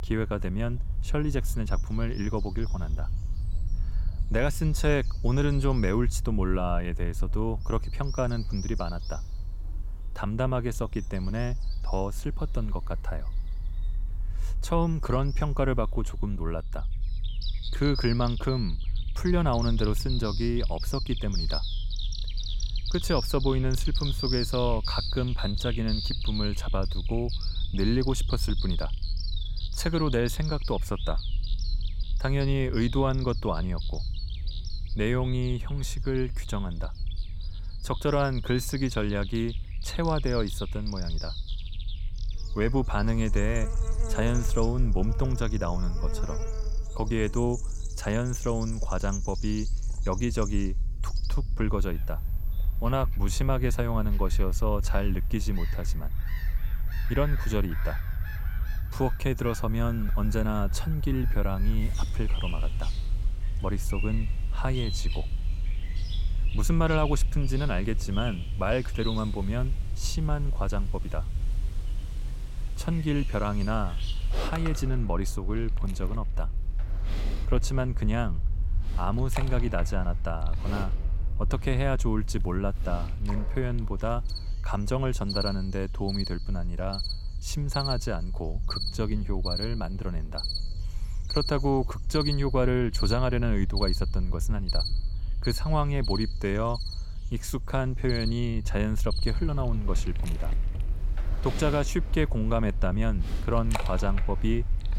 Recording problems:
animal sounds; loud; throughout; 10 dB below the speech
low rumble; faint; throughout; 20 dB below the speech

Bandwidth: 16.5 kHz